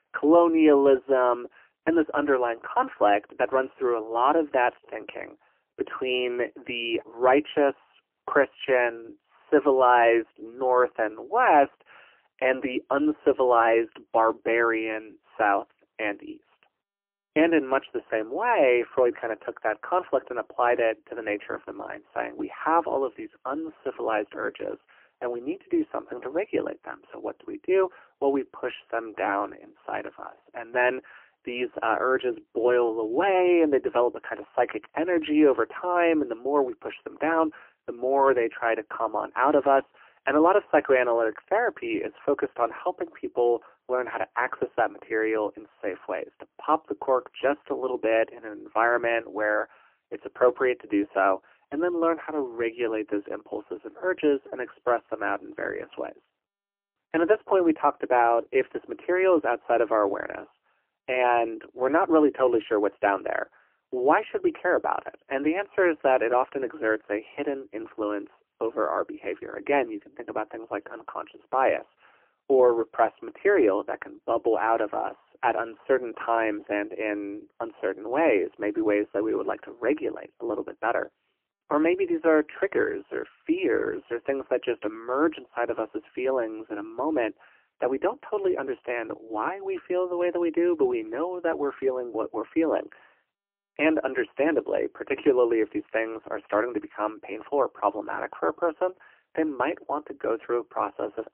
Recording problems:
phone-call audio; poor line; nothing above 3 kHz

